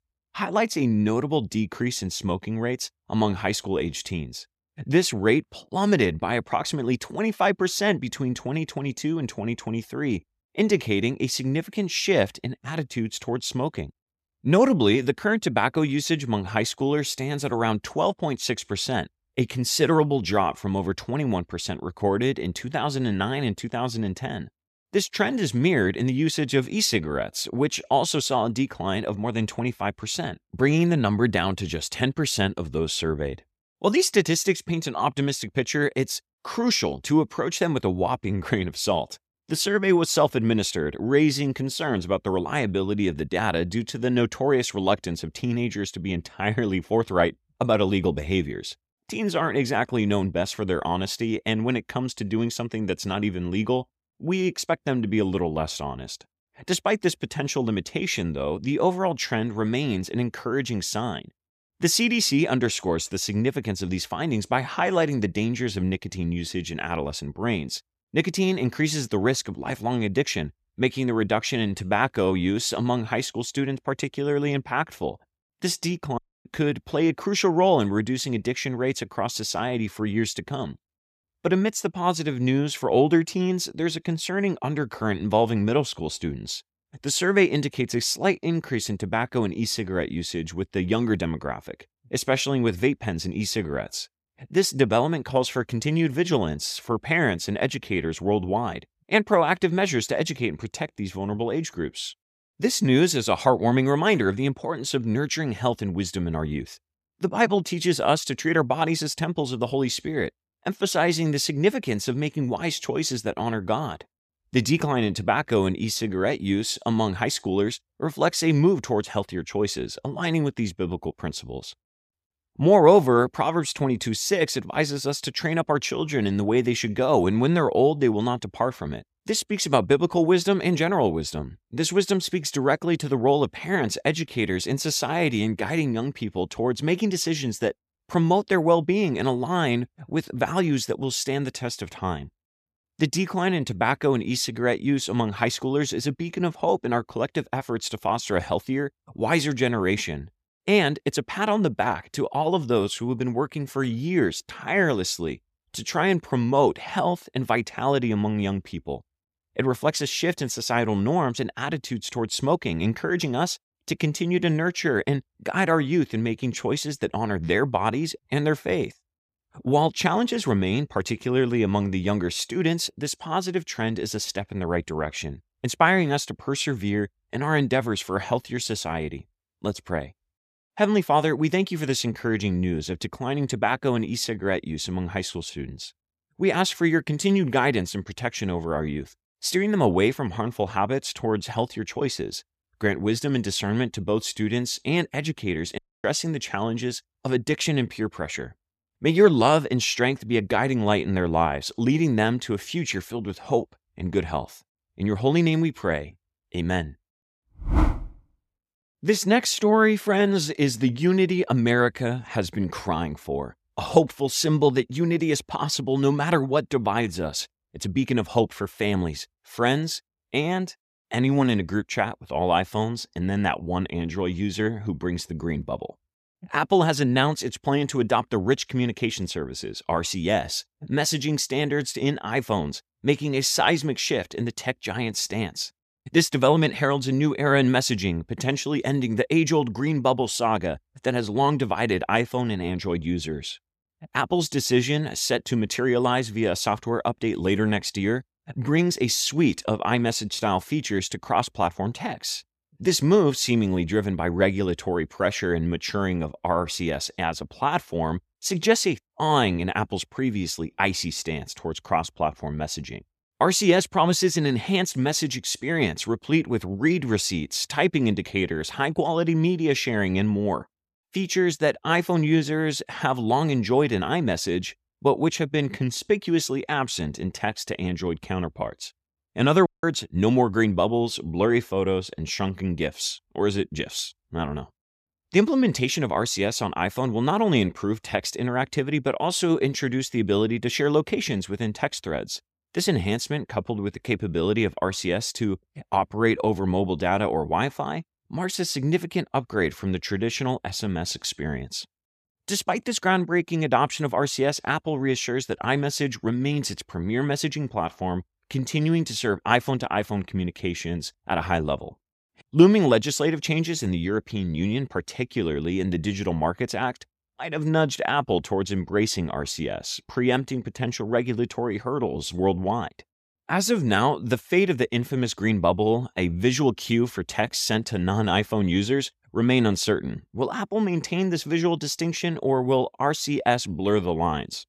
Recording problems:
audio cutting out; at 1:16, at 3:16 and at 4:40

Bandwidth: 14.5 kHz